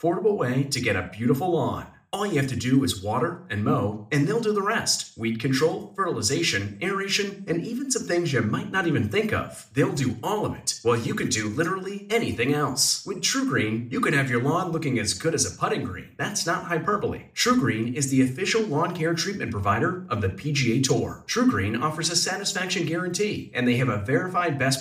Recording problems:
room echo; very slight; dies away in 0.4 s
off-mic speech; somewhat distant

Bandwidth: 15 kHz